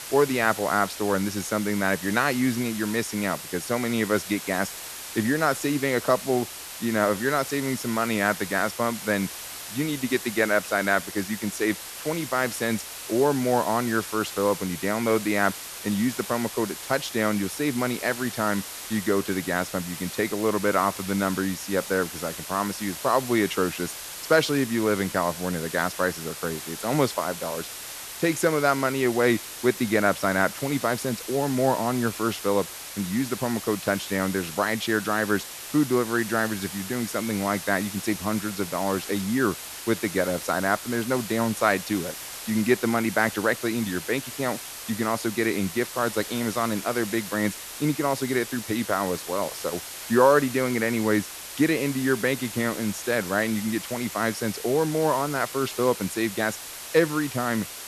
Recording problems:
hiss; loud; throughout; 9 dB below the speech

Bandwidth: 13.5 kHz